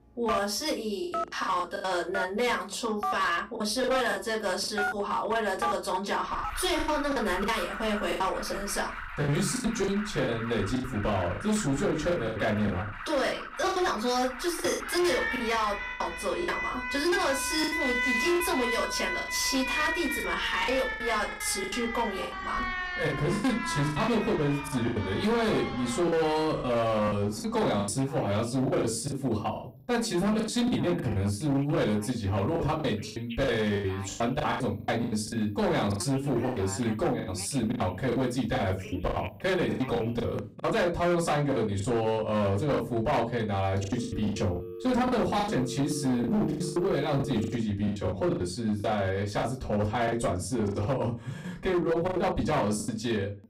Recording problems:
off-mic speech; far
distortion; slight; 13% of the sound clipped
room echo; very slight; dies away in 0.2 s
alarms or sirens; loud; throughout; 6 dB below the speech
choppy; very; 12% of the speech affected

